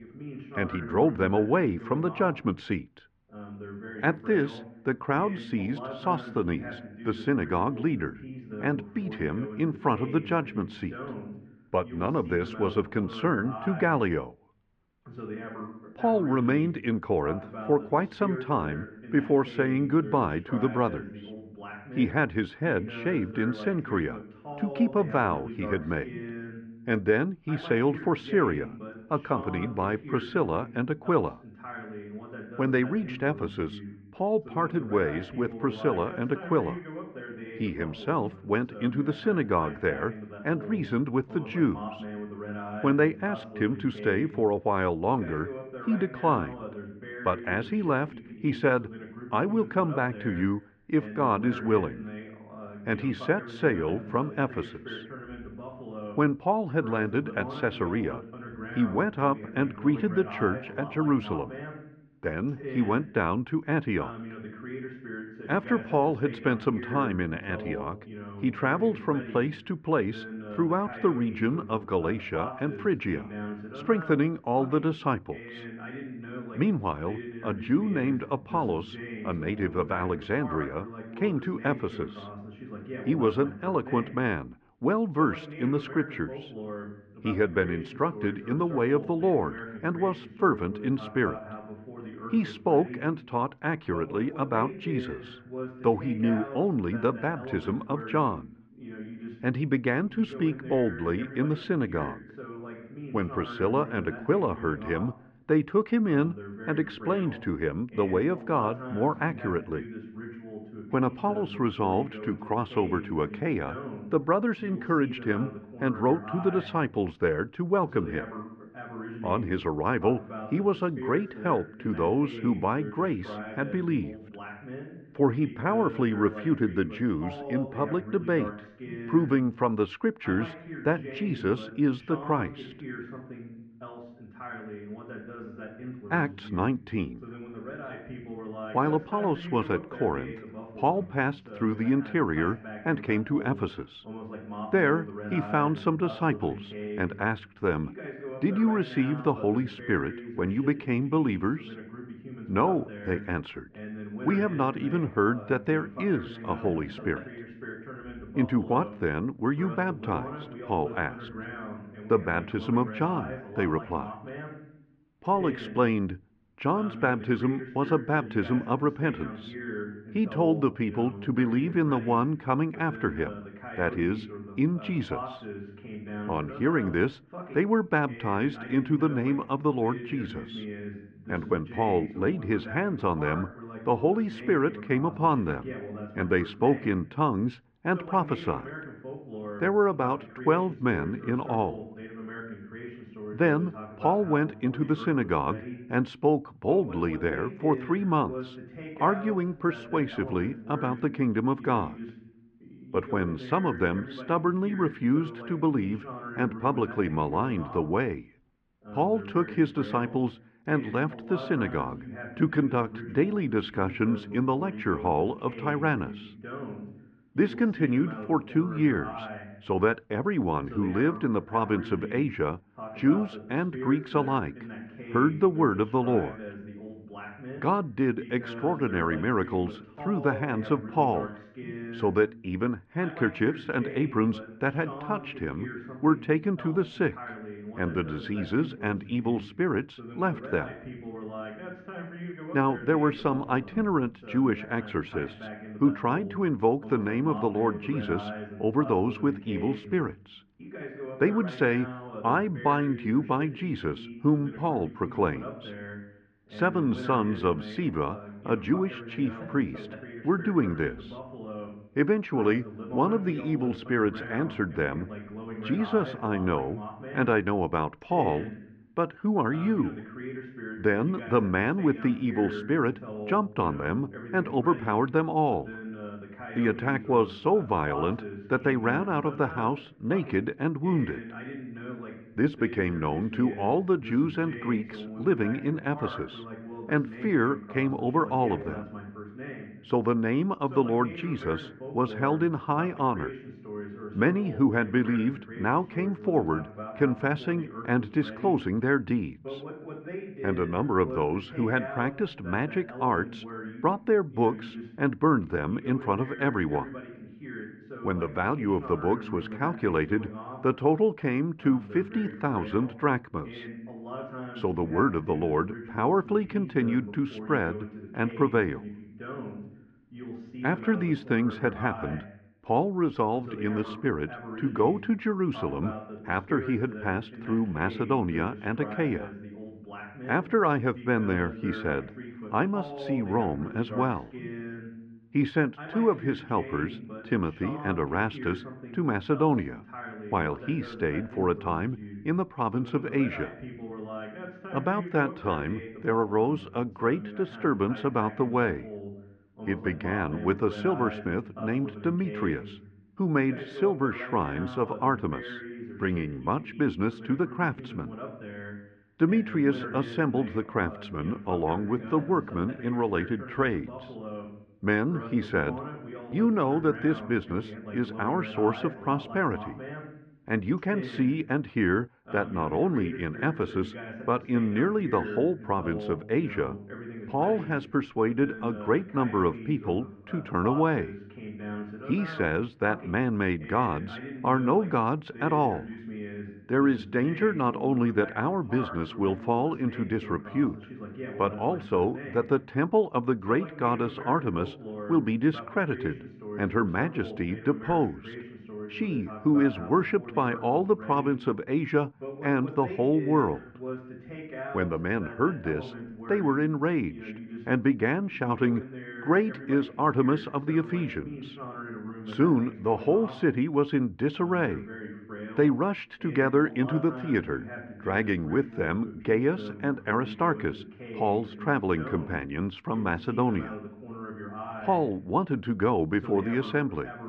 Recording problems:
muffled; very; fading above 2.5 kHz
voice in the background; noticeable; throughout; 15 dB below the speech

